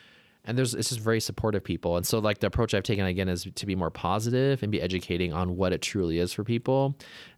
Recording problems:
none

